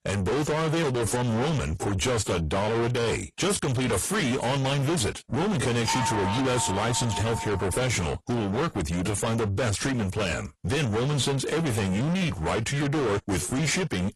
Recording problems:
distortion; heavy; 6 dB below the speech
garbled, watery; slightly; nothing above 11.5 kHz
doorbell; loud; from 6 to 7.5 s; peak 1 dB above the speech

